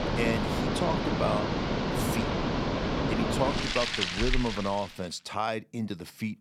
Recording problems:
rain or running water; very loud; until 4.5 s; 3 dB above the speech

